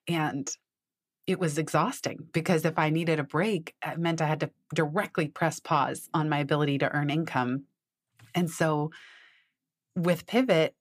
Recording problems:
none

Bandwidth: 15 kHz